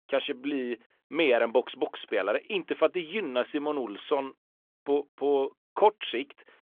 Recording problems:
phone-call audio; nothing above 3.5 kHz

